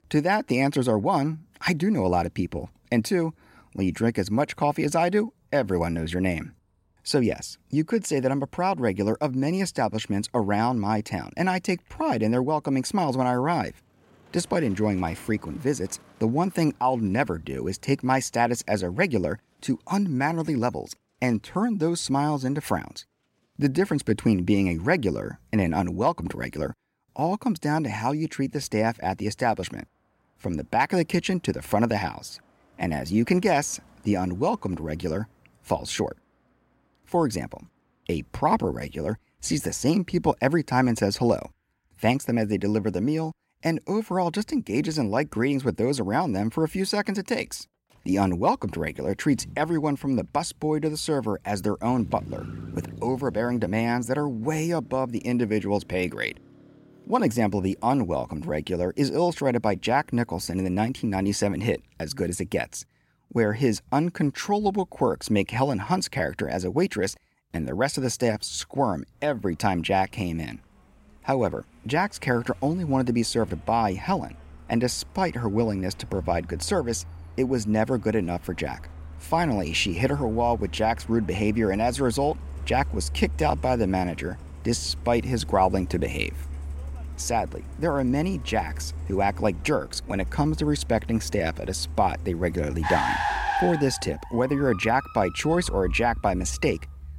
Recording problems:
traffic noise; noticeable; throughout; 10 dB below the speech

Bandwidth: 16 kHz